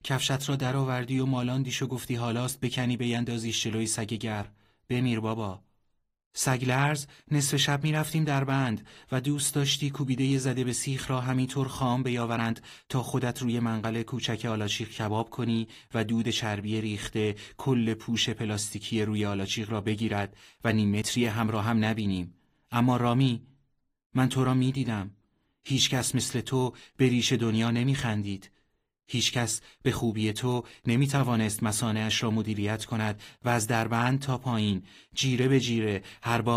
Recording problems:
garbled, watery; slightly; nothing above 15 kHz
abrupt cut into speech; at the end

